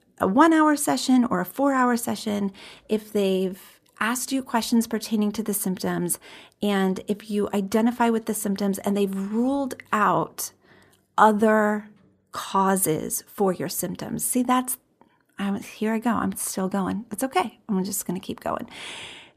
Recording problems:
none

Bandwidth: 14.5 kHz